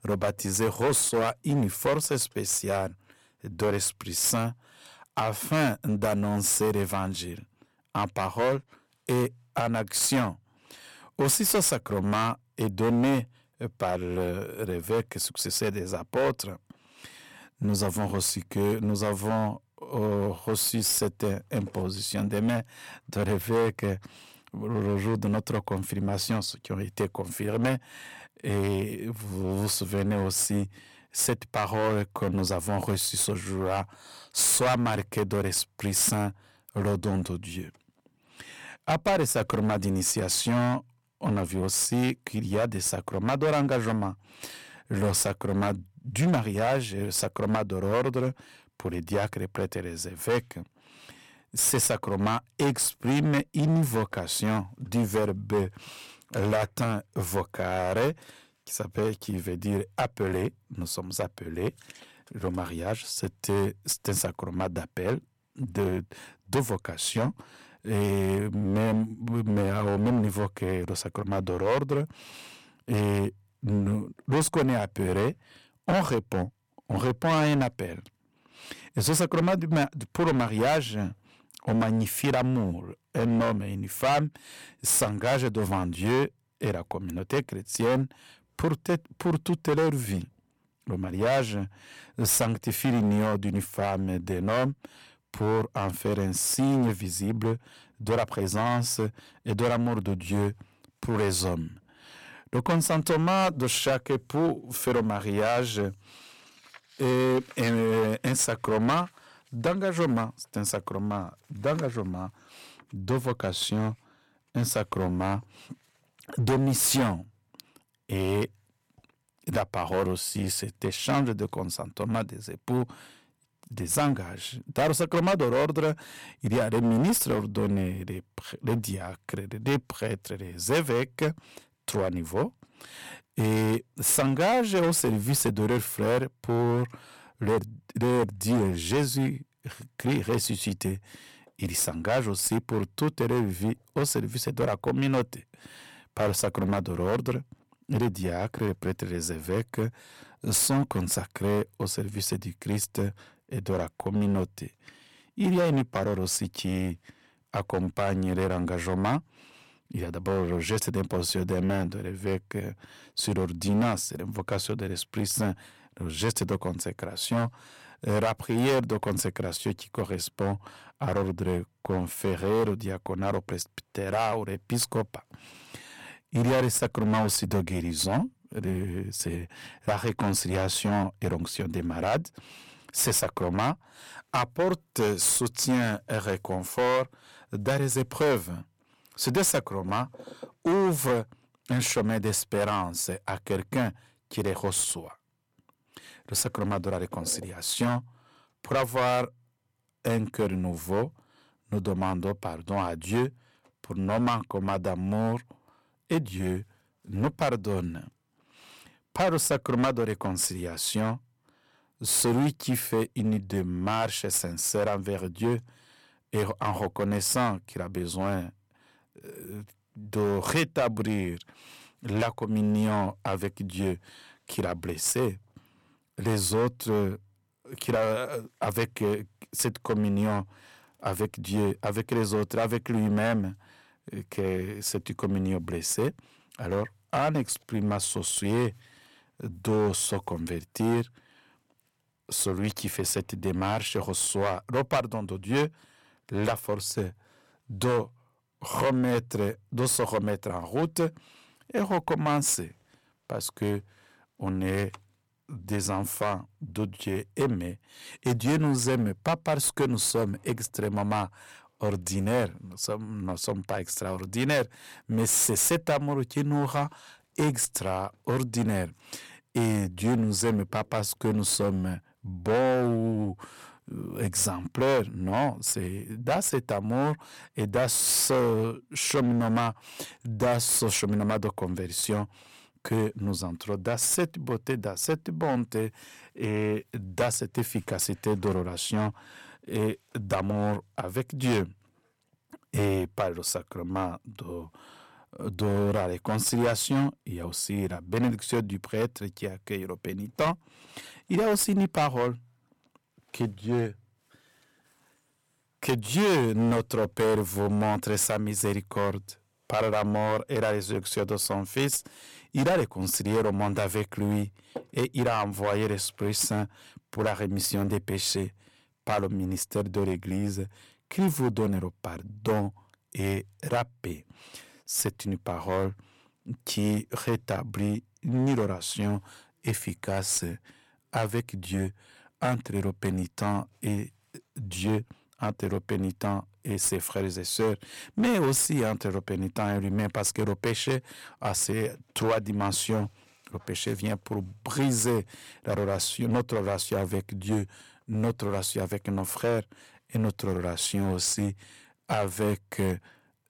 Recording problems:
distortion; heavy; 9% of the sound clipped

